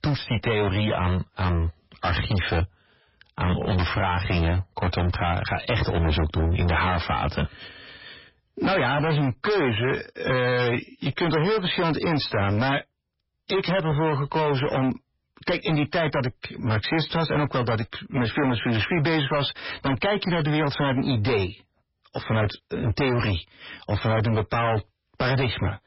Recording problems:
distortion; heavy; 25% of the sound clipped
garbled, watery; badly; nothing above 5.5 kHz

